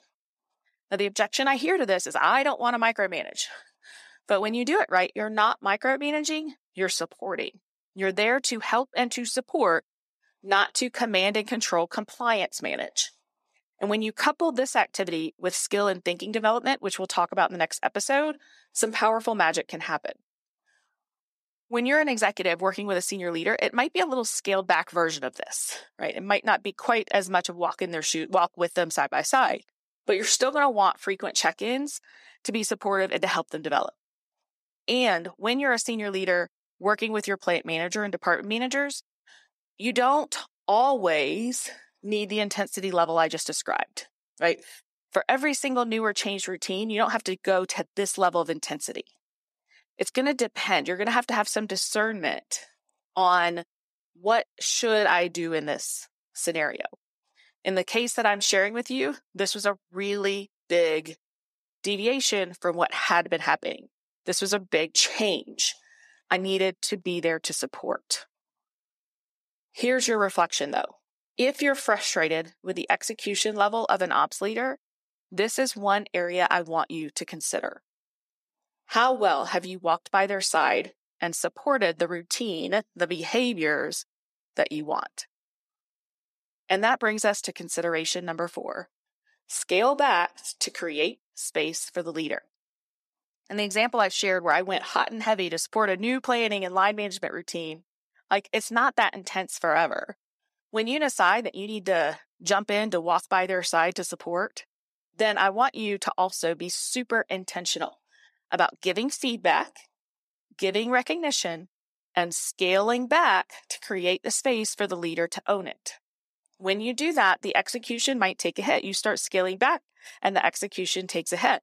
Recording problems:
thin; very slightly; fading below 350 Hz

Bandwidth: 14 kHz